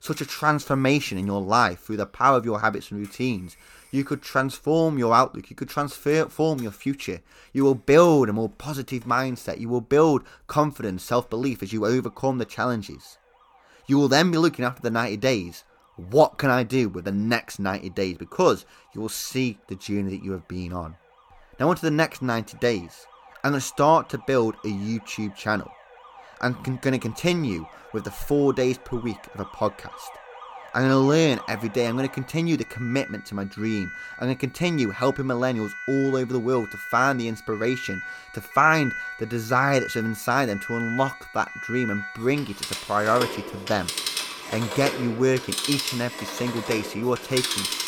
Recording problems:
alarms or sirens; loud; throughout; 9 dB below the speech

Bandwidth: 17.5 kHz